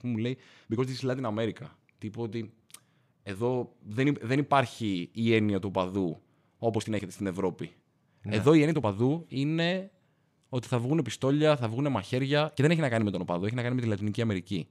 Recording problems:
uneven, jittery; strongly; from 0.5 to 13 s

